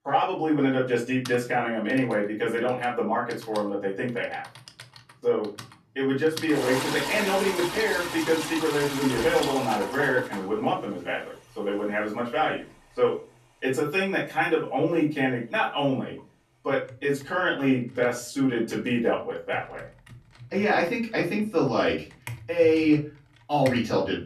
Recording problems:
off-mic speech; far
room echo; slight; dies away in 0.3 s
household noises; loud; throughout; 8 dB below the speech

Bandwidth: 13.5 kHz